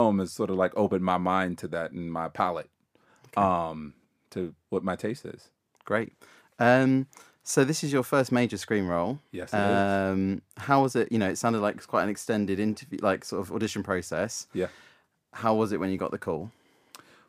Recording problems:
abrupt cut into speech; at the start

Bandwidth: 15 kHz